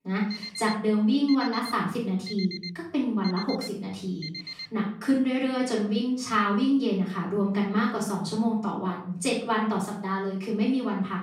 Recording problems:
off-mic speech; far
room echo; noticeable; dies away in 0.5 s
alarm; noticeable; until 4.5 s; peak 8 dB below the speech

